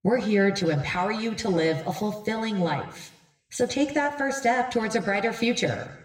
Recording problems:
room echo; slight; dies away in 0.8 s
off-mic speech; somewhat distant

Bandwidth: 16 kHz